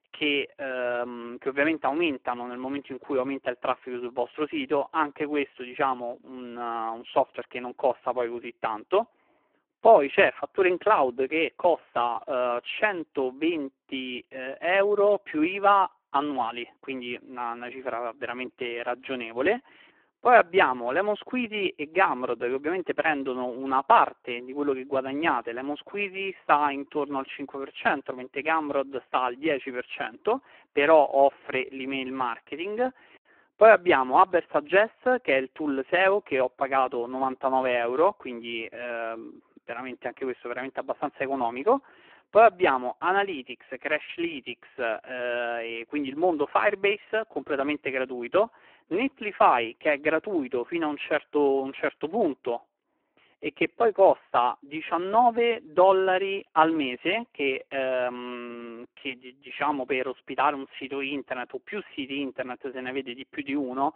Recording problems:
phone-call audio; poor line

